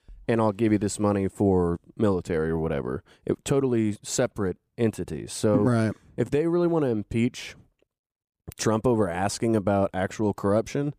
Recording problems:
none

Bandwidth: 15 kHz